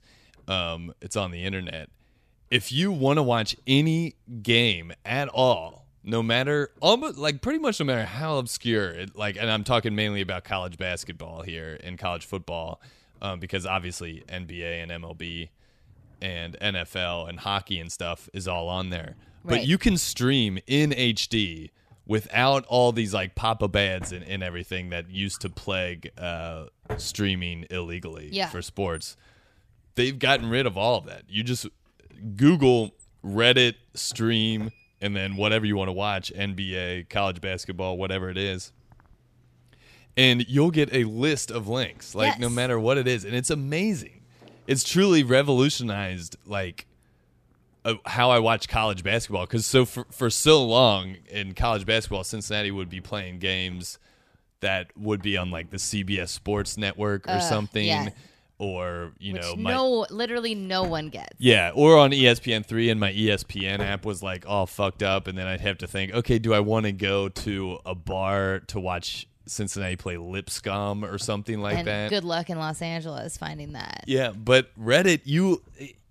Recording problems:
household noises; faint; throughout; 25 dB below the speech

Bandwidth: 14.5 kHz